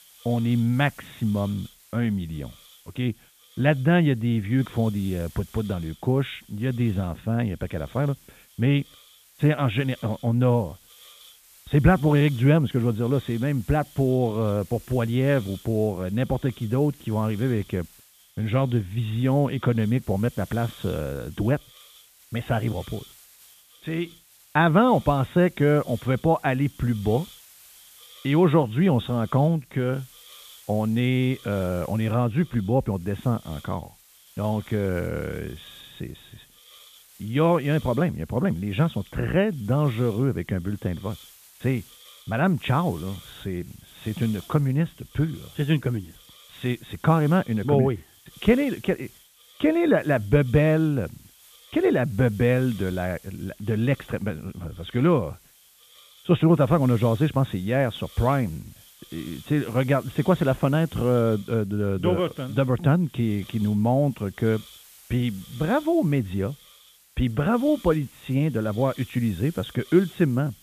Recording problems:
high frequencies cut off; severe; nothing above 4 kHz
hiss; faint; throughout; 25 dB below the speech

